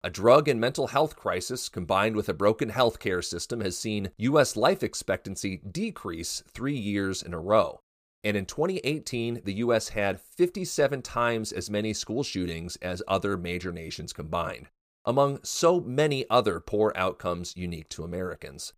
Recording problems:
none

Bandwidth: 15 kHz